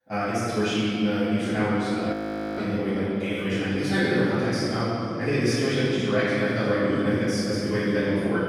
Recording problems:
room echo; strong; dies away in 3 s
off-mic speech; far
wrong speed, natural pitch; too fast; 1.7 times normal speed
audio freezing; at 2 s

